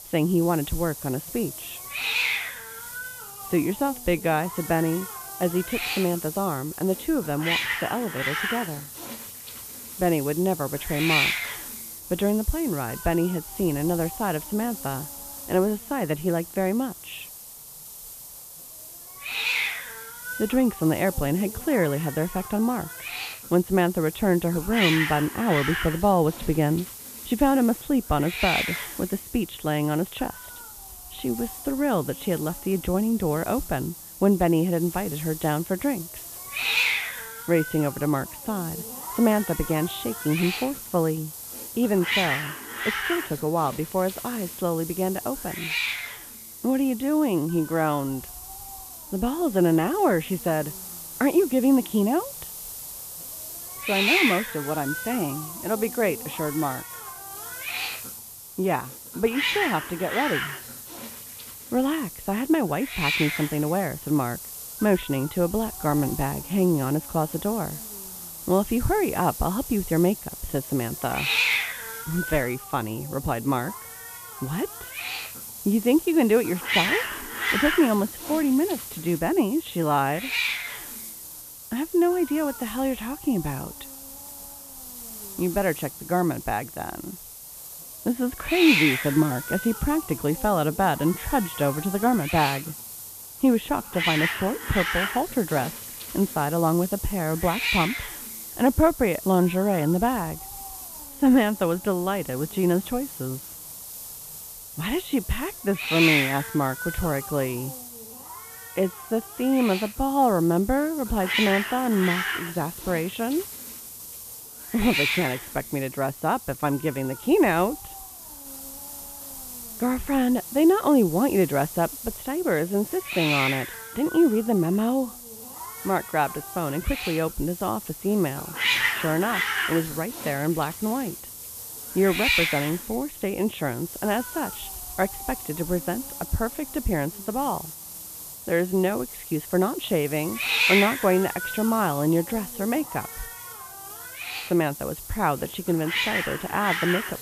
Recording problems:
high frequencies cut off; severe; nothing above 4 kHz
hiss; loud; throughout; 5 dB below the speech

